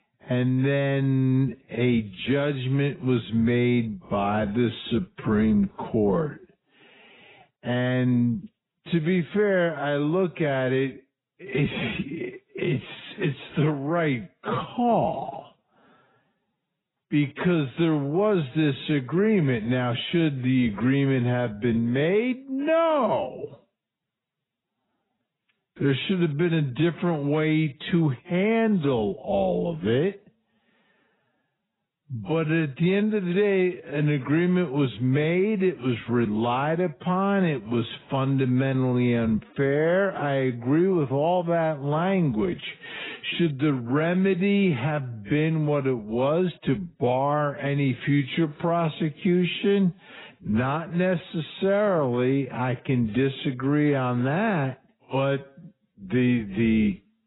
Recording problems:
garbled, watery; badly; nothing above 4 kHz
wrong speed, natural pitch; too slow; 0.6 times normal speed

